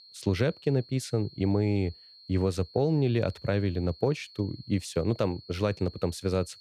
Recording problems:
high-pitched whine; faint; throughout; 4 kHz, 20 dB below the speech

